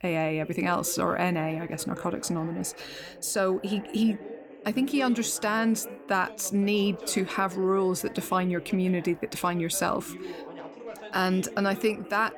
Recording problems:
background chatter; noticeable; throughout; 2 voices, 15 dB below the speech

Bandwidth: 18.5 kHz